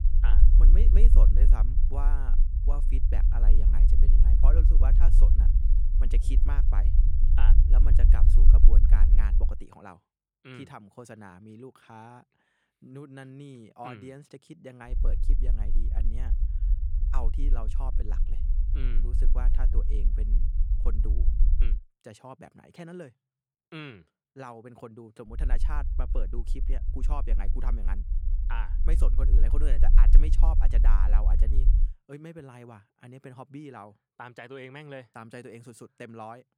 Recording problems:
low rumble; loud; until 9.5 s, from 15 to 22 s and from 25 to 32 s; 4 dB below the speech

